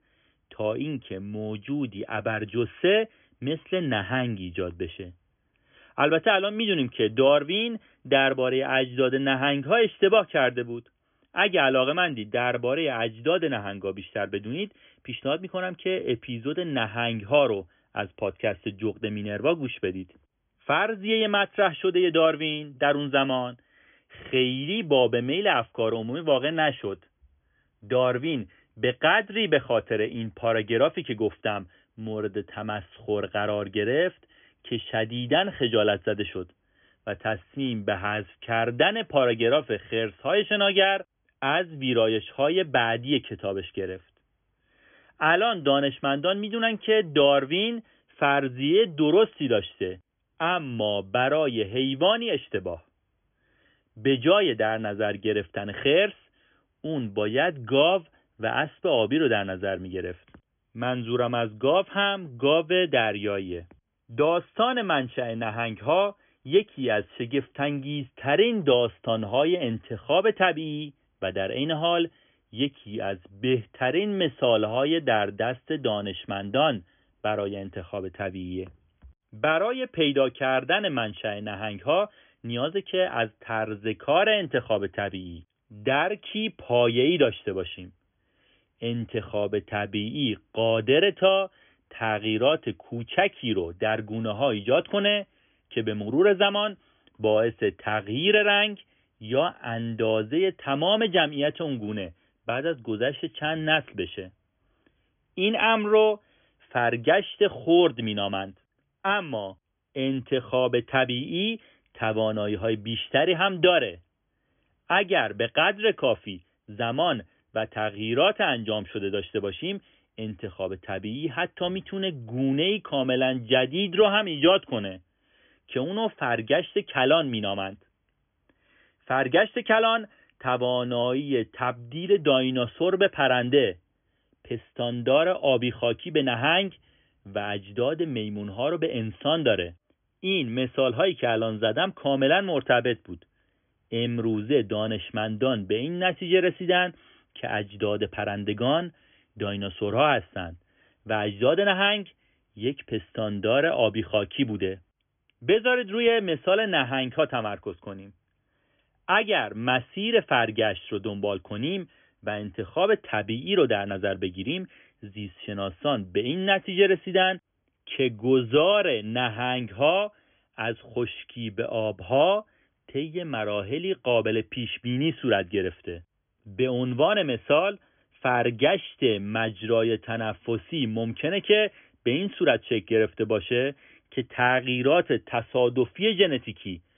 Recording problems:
high frequencies cut off; severe; nothing above 3.5 kHz

